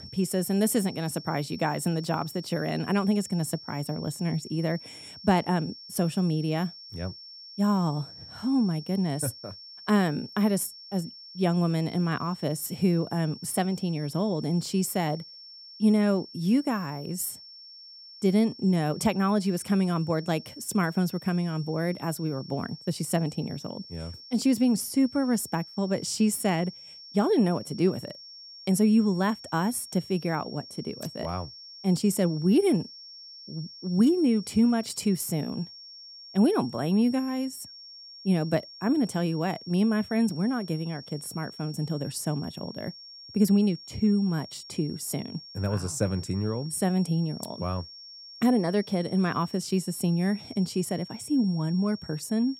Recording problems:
high-pitched whine; noticeable; throughout; 5.5 kHz, 15 dB below the speech

